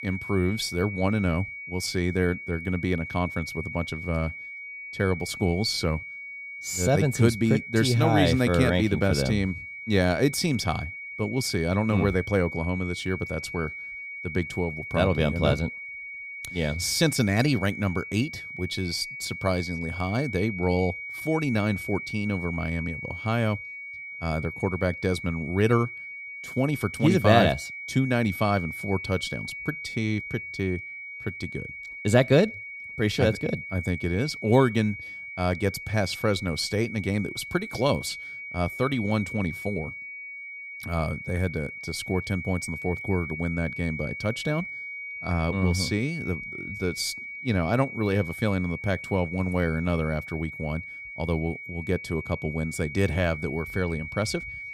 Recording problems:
high-pitched whine; loud; throughout; 2.5 kHz, 9 dB below the speech

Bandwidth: 14.5 kHz